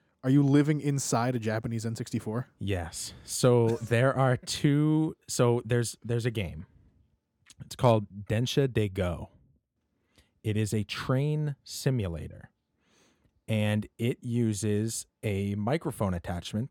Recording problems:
none

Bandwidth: 17 kHz